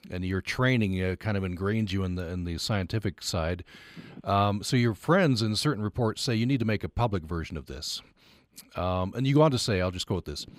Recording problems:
none

